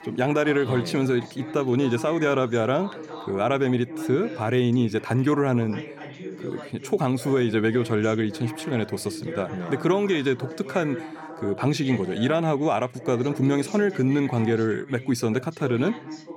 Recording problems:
background chatter; noticeable; throughout; 2 voices, 15 dB below the speech

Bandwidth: 16.5 kHz